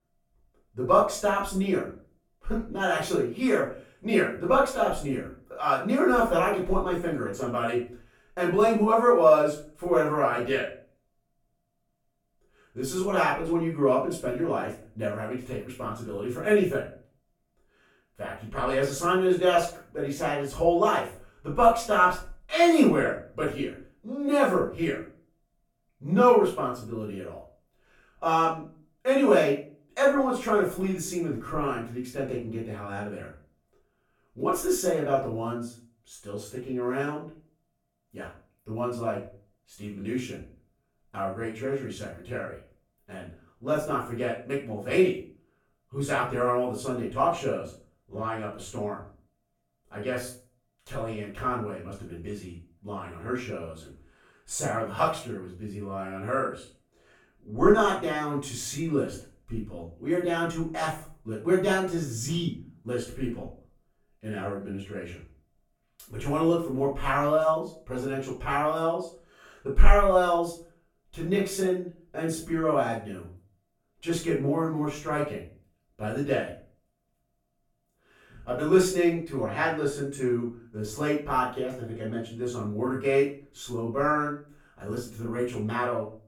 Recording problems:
off-mic speech; far
room echo; noticeable; dies away in 0.3 s

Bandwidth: 17 kHz